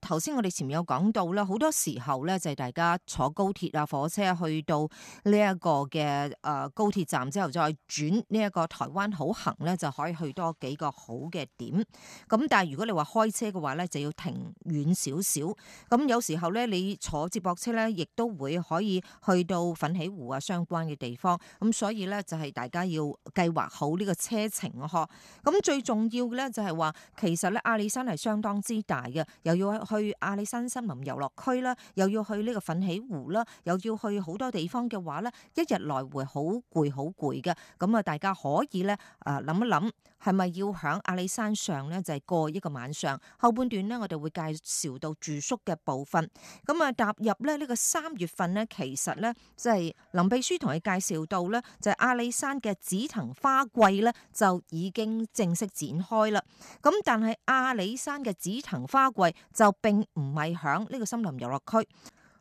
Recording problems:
none

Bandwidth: 14 kHz